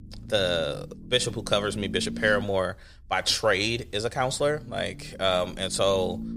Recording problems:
low rumble; faint; throughout; 20 dB below the speech

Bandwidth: 15 kHz